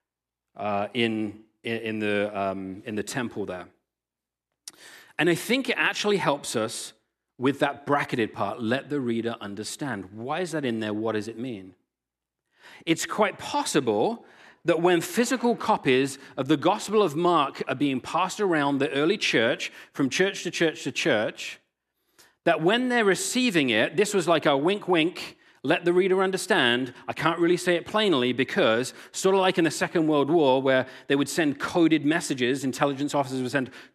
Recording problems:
none

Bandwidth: 13.5 kHz